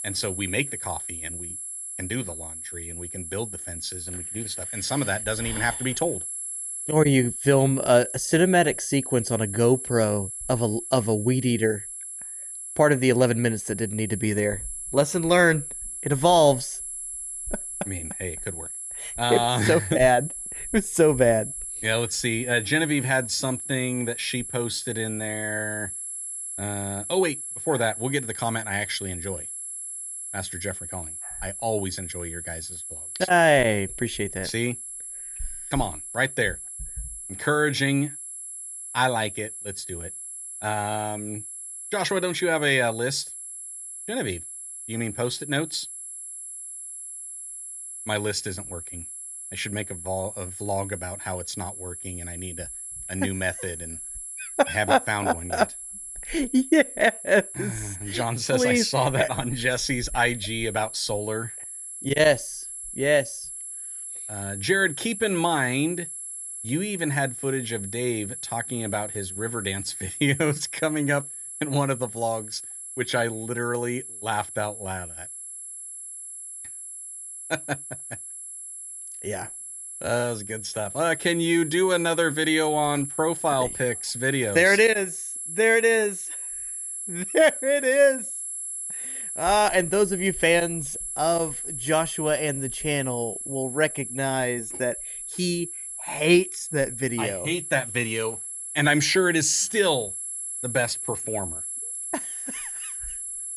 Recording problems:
high-pitched whine; loud; throughout; 11 kHz, 8 dB below the speech

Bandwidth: 14.5 kHz